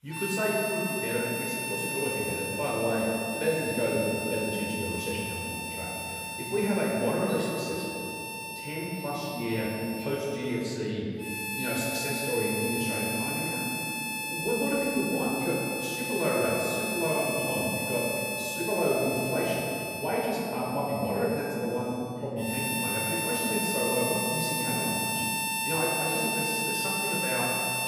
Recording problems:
off-mic speech; far
room echo; noticeable; dies away in 2.6 s
background music; loud; throughout; as loud as the speech

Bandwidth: 15 kHz